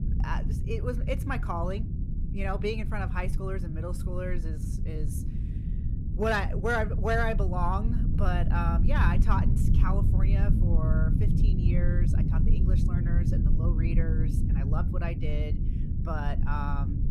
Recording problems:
low rumble; loud; throughout; 8 dB below the speech

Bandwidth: 15.5 kHz